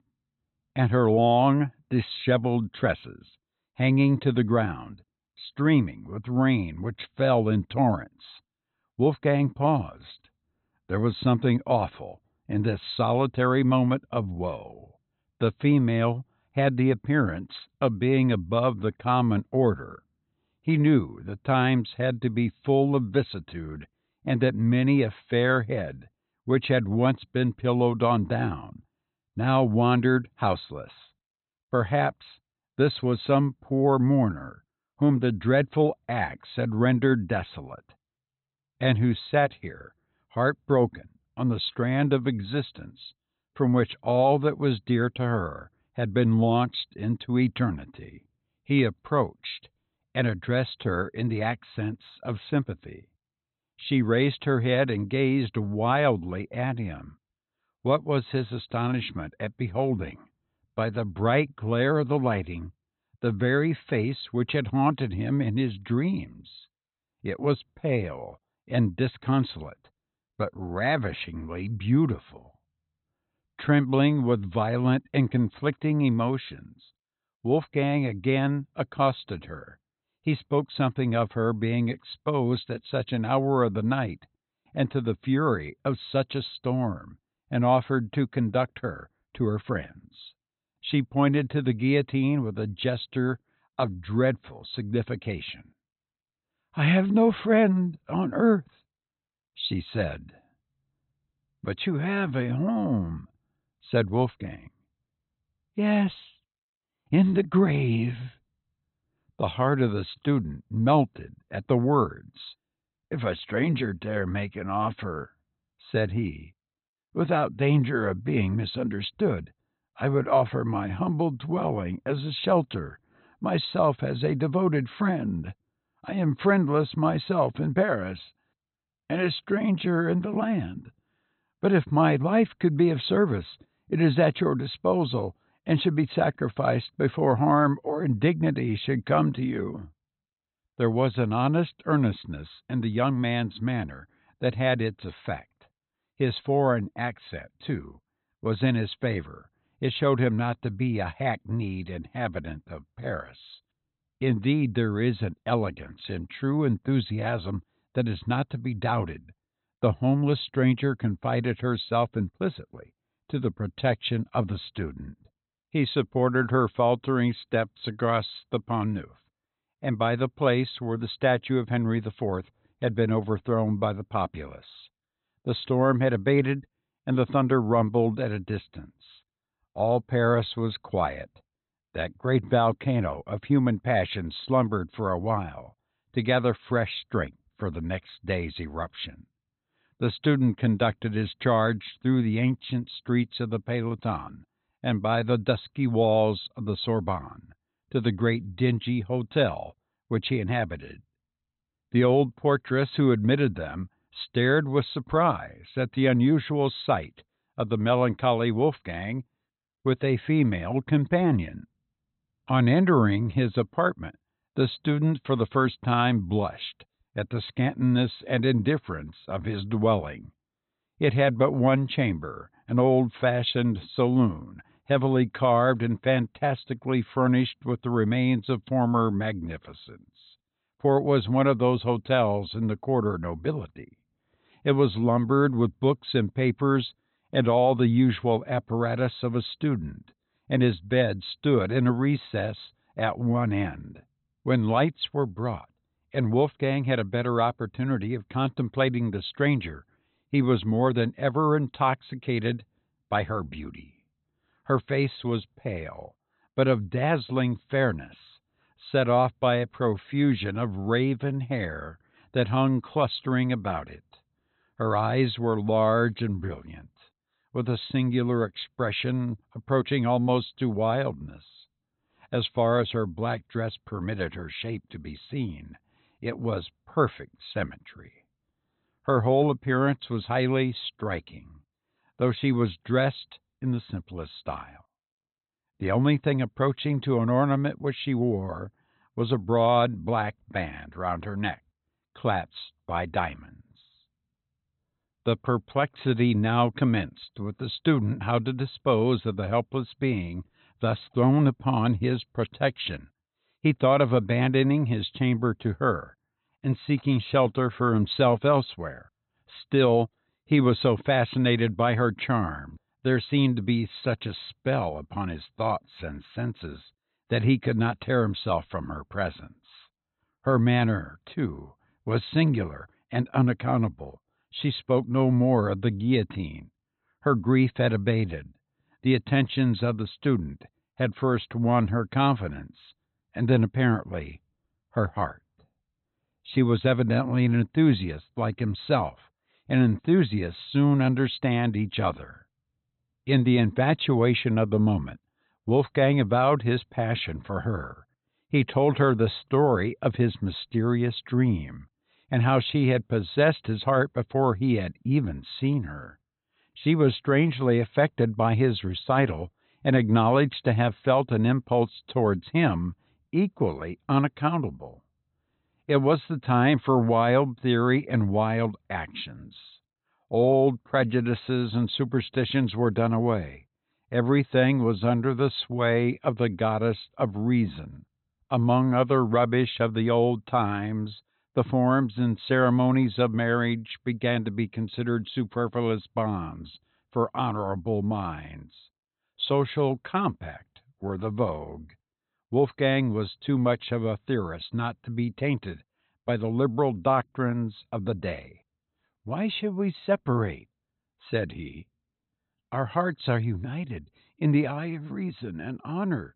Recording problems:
high frequencies cut off; severe; nothing above 4 kHz

